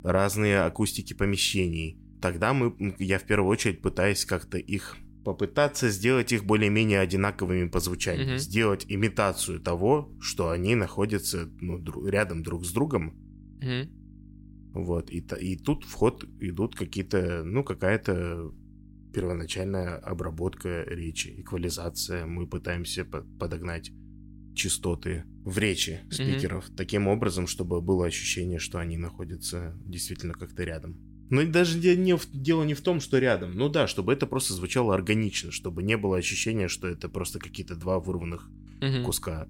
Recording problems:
electrical hum; faint; throughout; 50 Hz, 30 dB below the speech

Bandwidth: 16 kHz